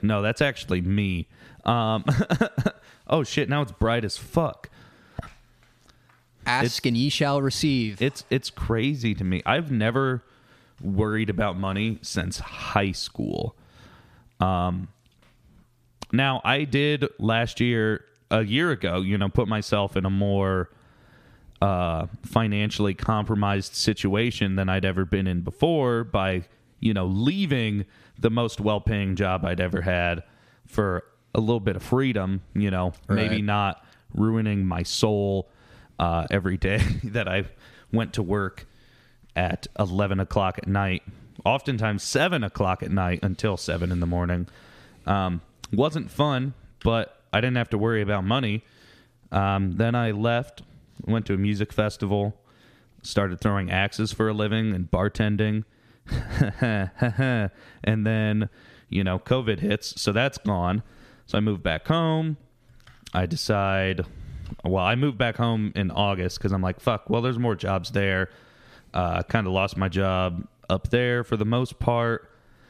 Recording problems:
squashed, flat; somewhat

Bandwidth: 14.5 kHz